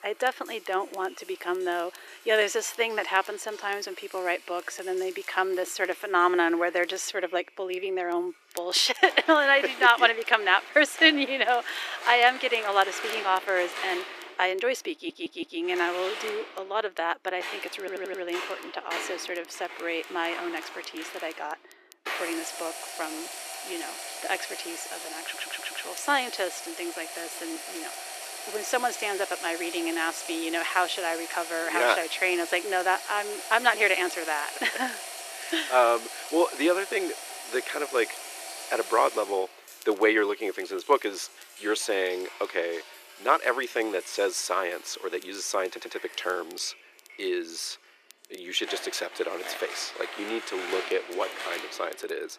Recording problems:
thin; very; fading below 350 Hz
household noises; noticeable; throughout; 10 dB below the speech
crackle, like an old record; faint; 25 dB below the speech
audio stuttering; 4 times, first at 15 s

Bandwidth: 14.5 kHz